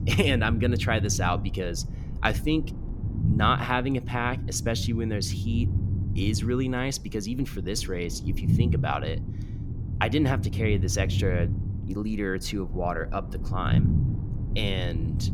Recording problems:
low rumble; noticeable; throughout; 10 dB below the speech

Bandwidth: 17.5 kHz